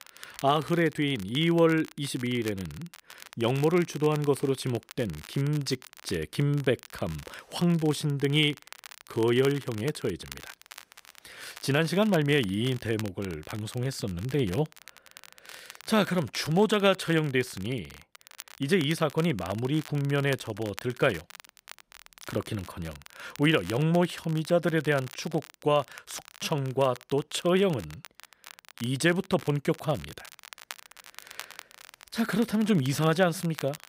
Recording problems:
crackle, like an old record; noticeable; 20 dB below the speech

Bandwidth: 15.5 kHz